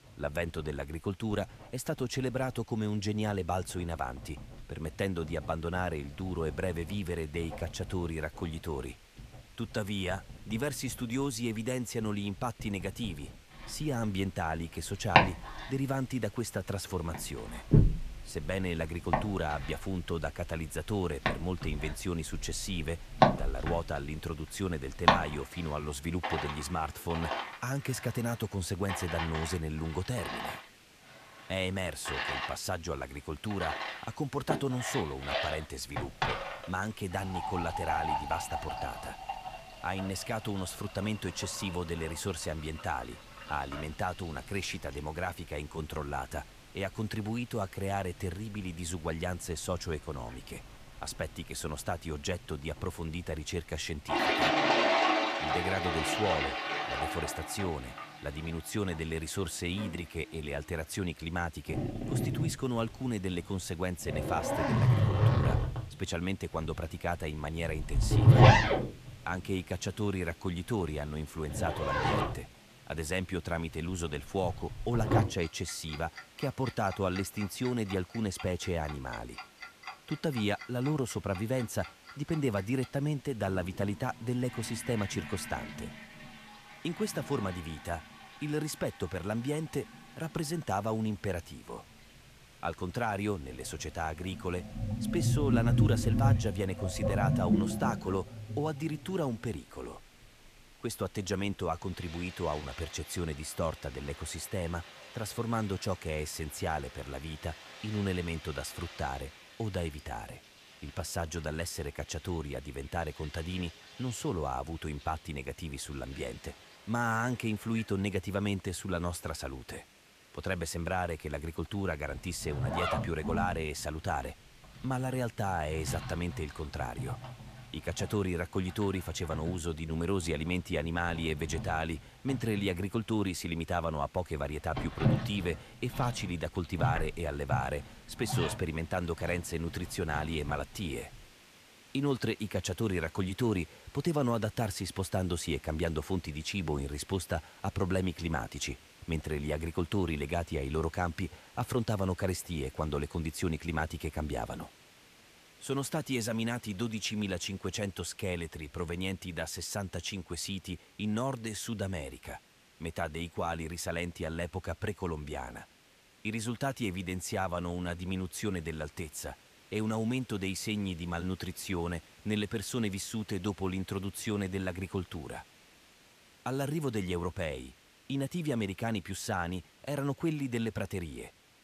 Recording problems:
household noises; very loud; until 2:21; 3 dB above the speech
hiss; faint; throughout; 20 dB below the speech

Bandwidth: 14.5 kHz